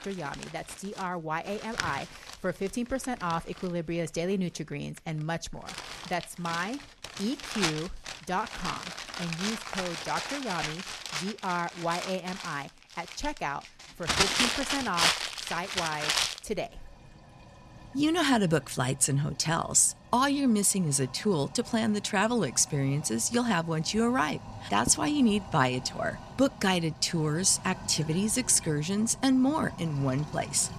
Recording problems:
household noises; loud; throughout; 5 dB below the speech

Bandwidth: 14 kHz